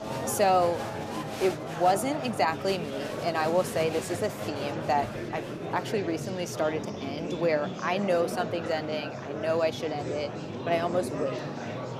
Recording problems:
murmuring crowd; loud; throughout; 6 dB below the speech
animal sounds; noticeable; throughout; 20 dB below the speech

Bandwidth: 14.5 kHz